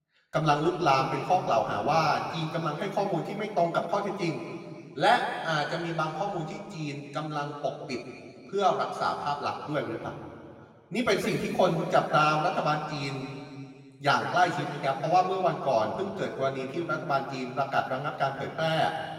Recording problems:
off-mic speech; far
room echo; noticeable; dies away in 2.2 s

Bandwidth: 16 kHz